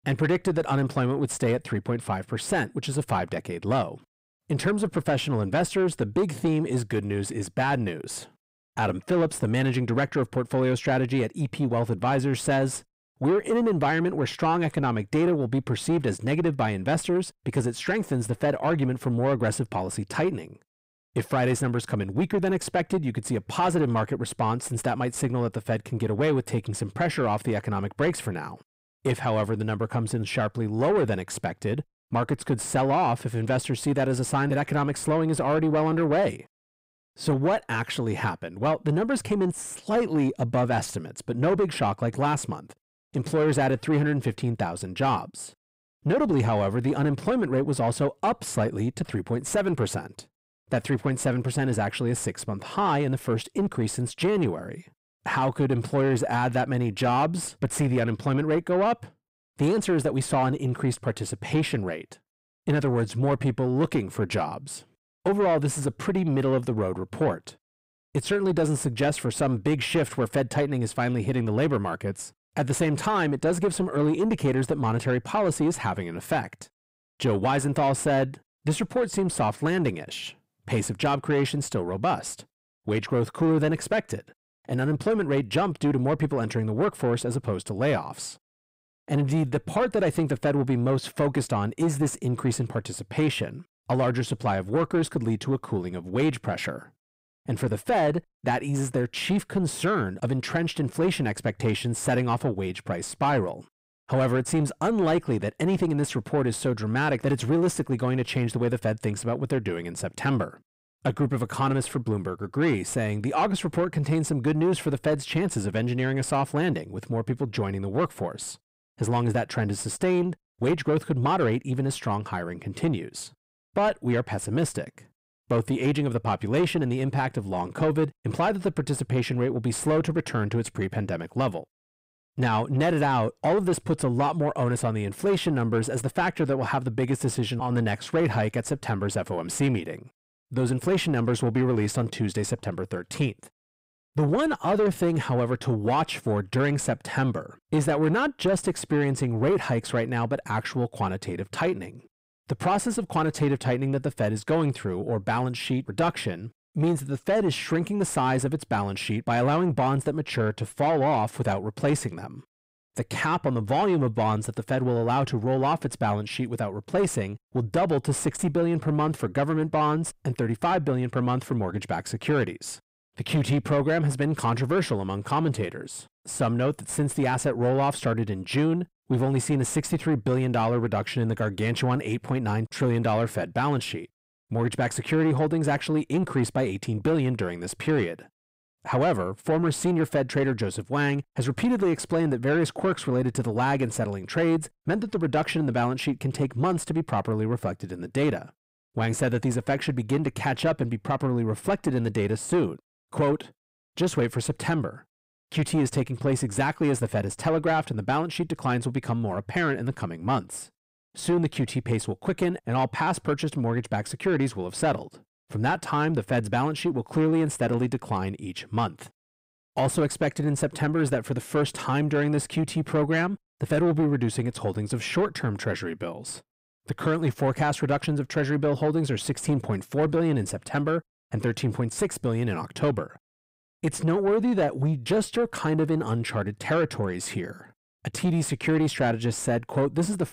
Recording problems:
distortion; slight; 10 dB below the speech

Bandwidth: 15.5 kHz